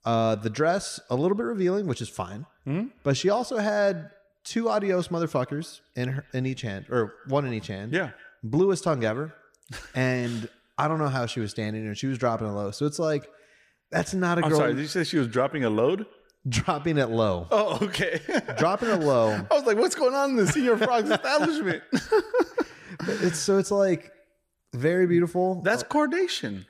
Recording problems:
echo of what is said; faint; throughout; 120 ms later, 25 dB below the speech

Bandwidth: 15 kHz